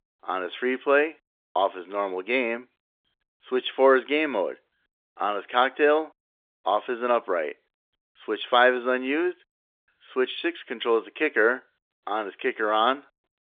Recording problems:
phone-call audio; nothing above 3.5 kHz

